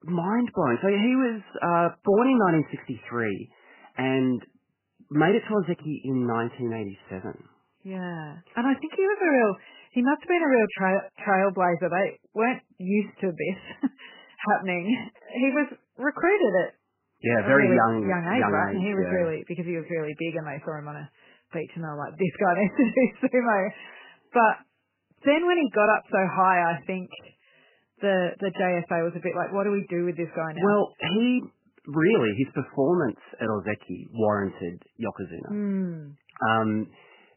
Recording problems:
garbled, watery; badly; nothing above 3 kHz

